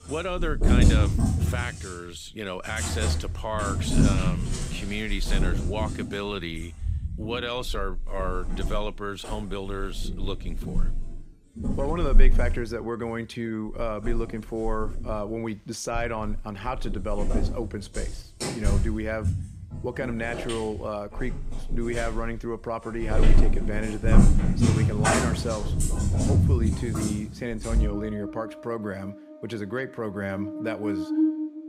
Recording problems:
animal sounds; very loud; throughout; 5 dB above the speech

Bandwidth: 15.5 kHz